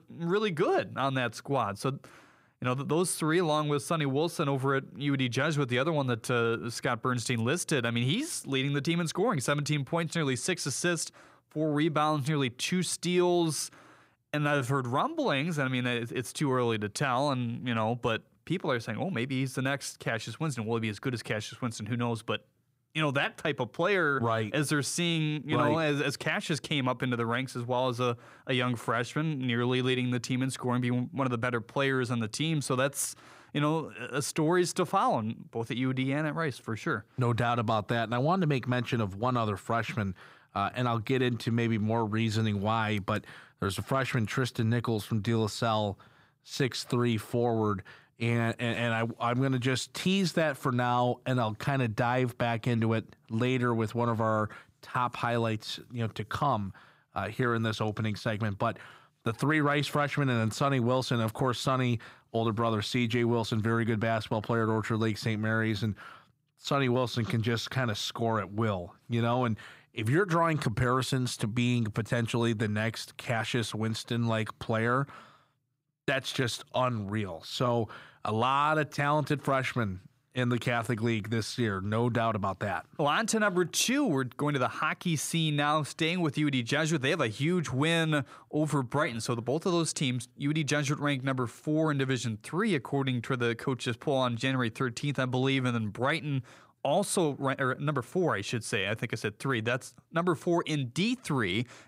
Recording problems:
none

